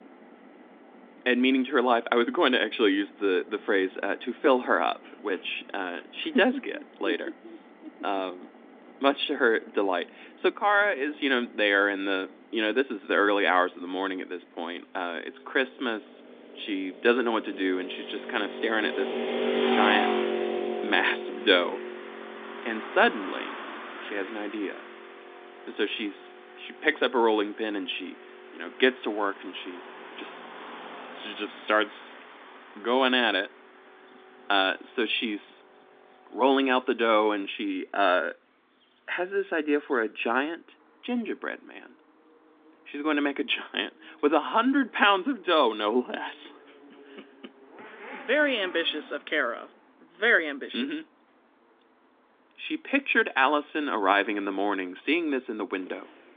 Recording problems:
phone-call audio
traffic noise; loud; throughout; 9 dB below the speech

